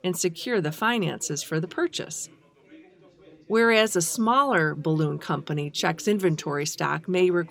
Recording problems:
background chatter; faint; throughout; 4 voices, 30 dB below the speech

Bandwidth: 17.5 kHz